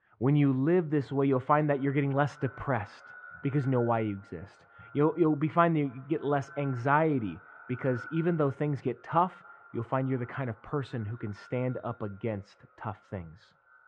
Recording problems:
muffled; very; fading above 1.5 kHz
echo of what is said; faint; throughout; 270 ms later, 20 dB below the speech

